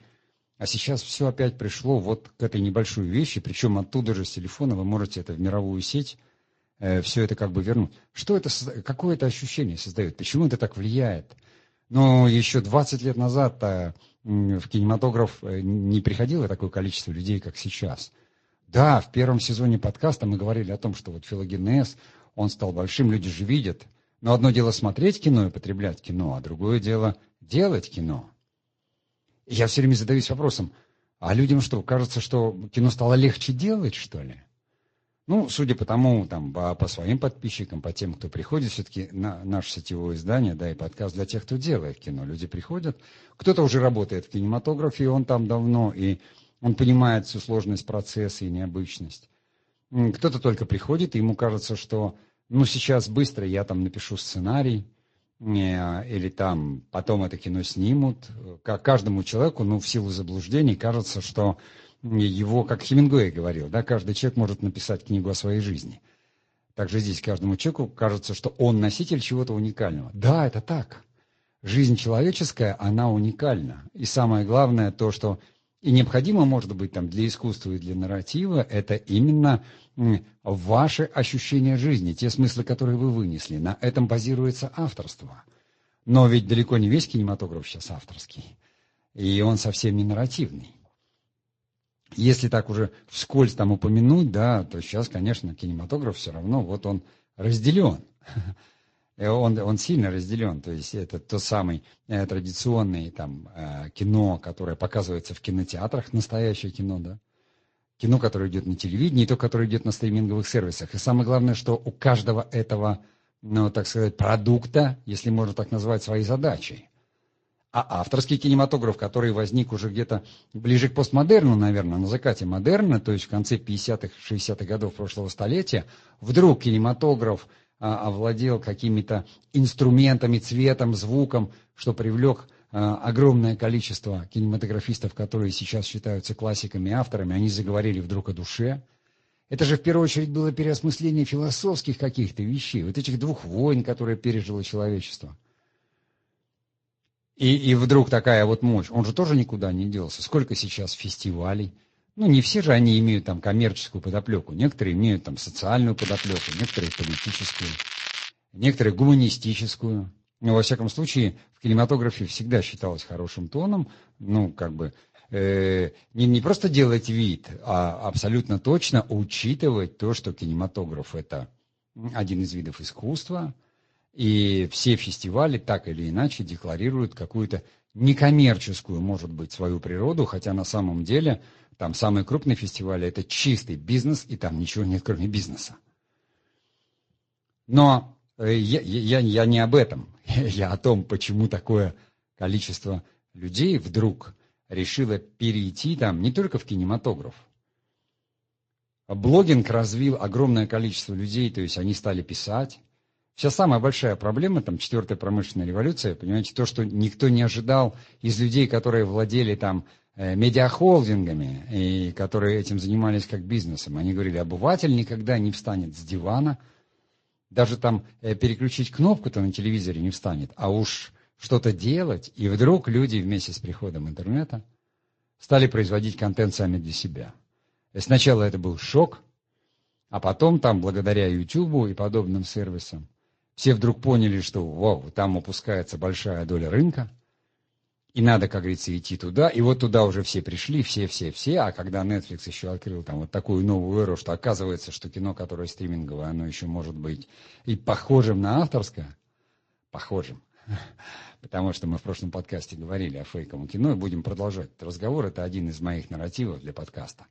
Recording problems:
garbled, watery; slightly; nothing above 7.5 kHz
crackling; loud; from 2:36 to 2:38; 7 dB below the speech

